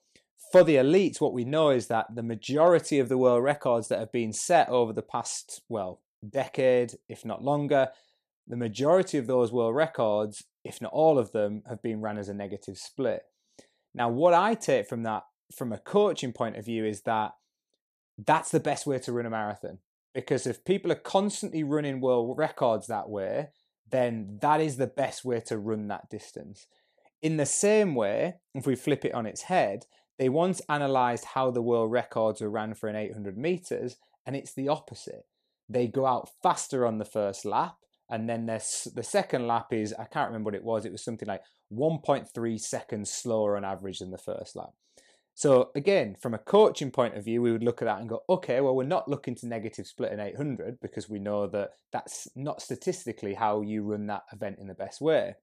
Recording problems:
none

